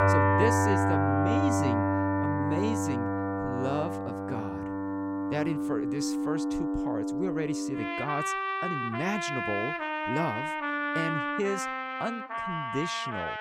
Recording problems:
background music; very loud; throughout; 5 dB above the speech

